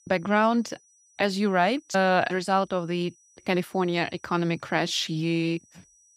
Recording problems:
high-pitched whine; faint; throughout; 6 kHz, 30 dB below the speech

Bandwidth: 15.5 kHz